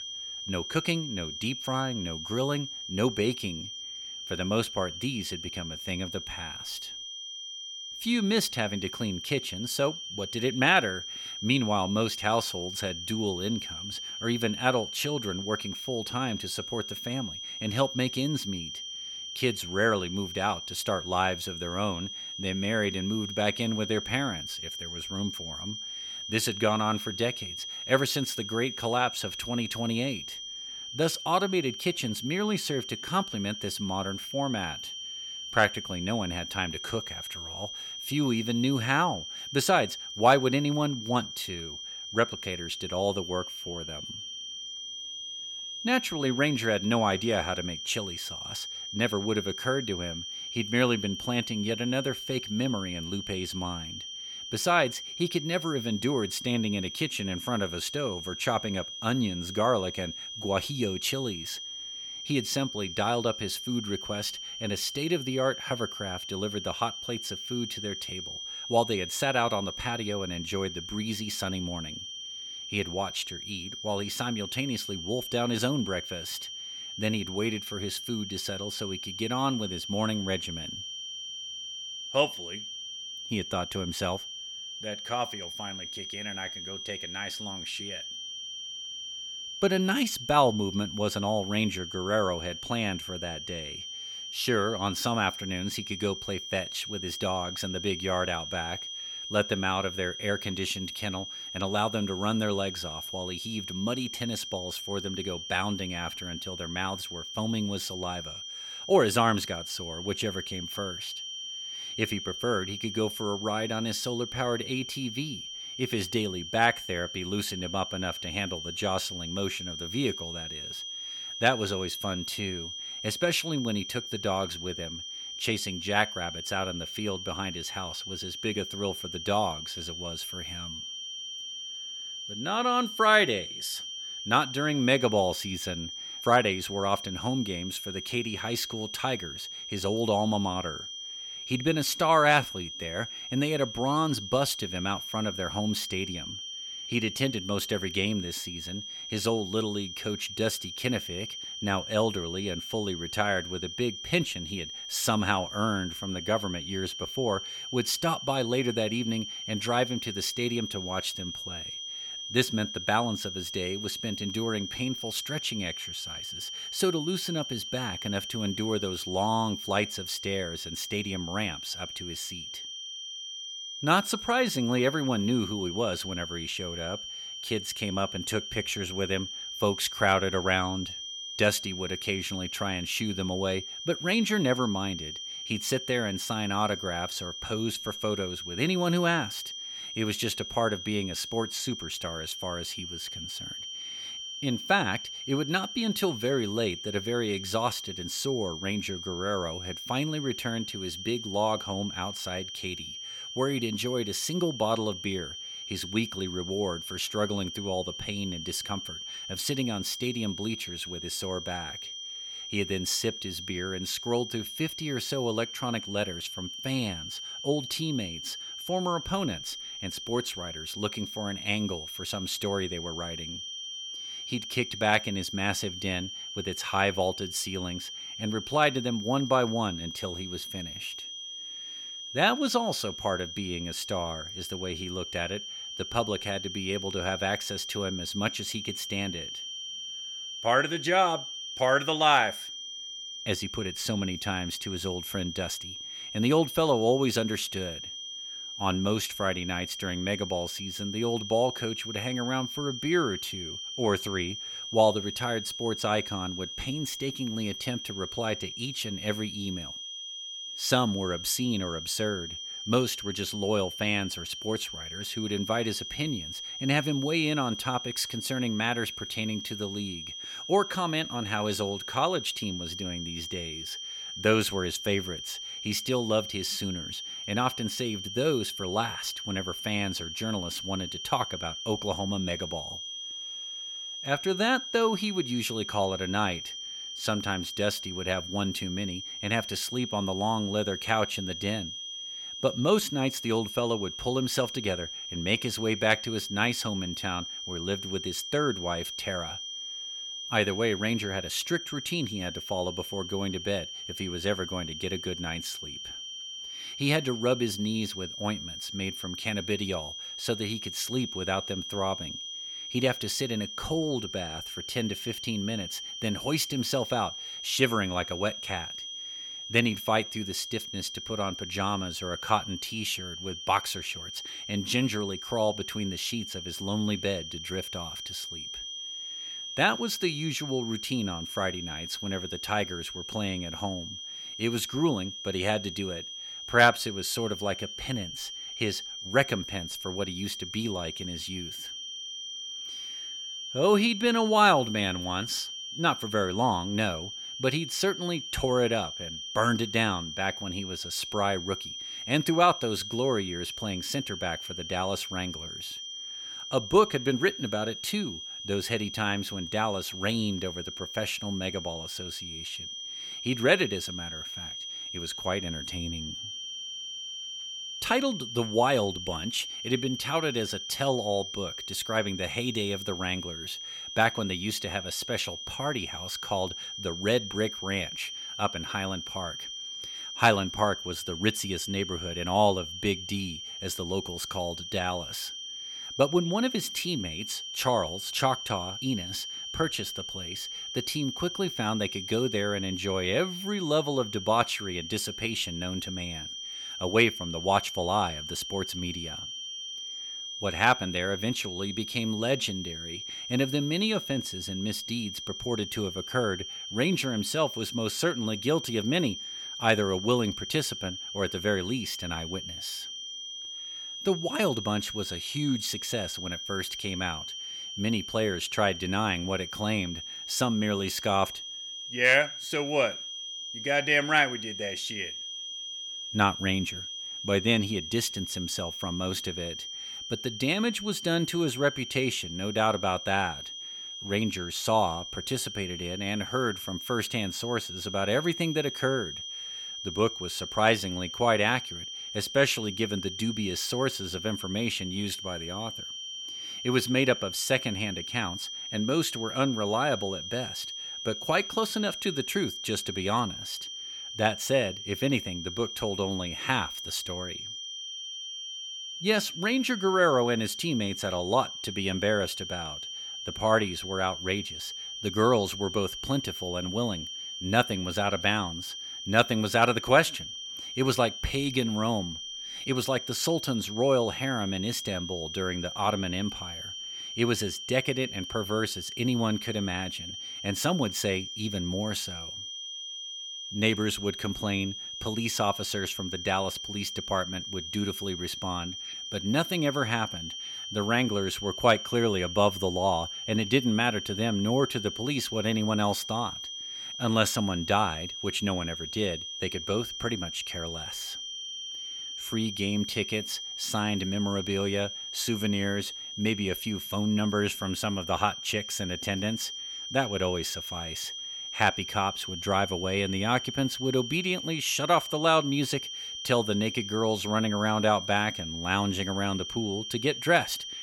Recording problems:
high-pitched whine; loud; throughout; 3 kHz, 6 dB below the speech

